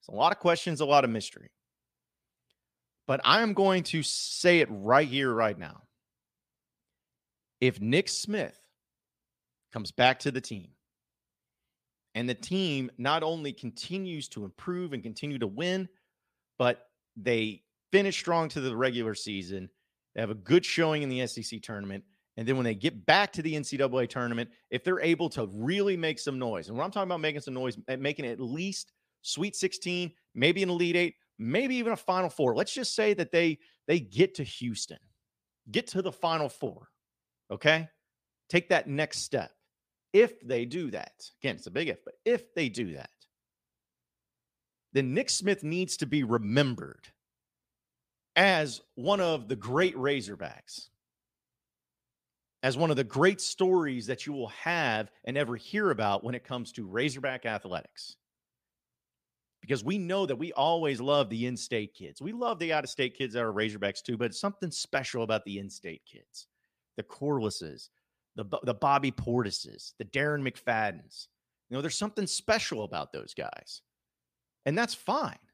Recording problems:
none

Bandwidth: 15 kHz